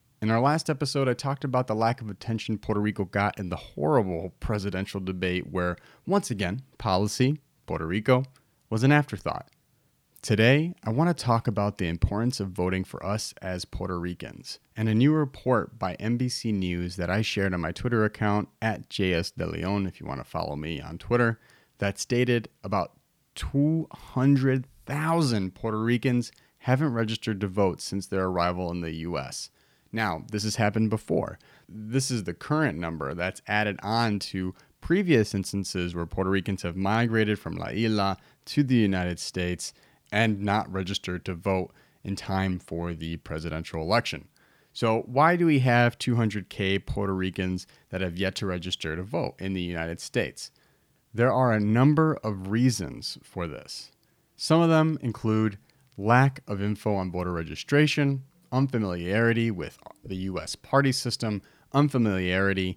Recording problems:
none

